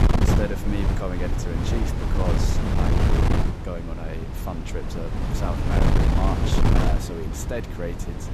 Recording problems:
wind noise on the microphone; heavy; 3 dB above the speech

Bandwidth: 14.5 kHz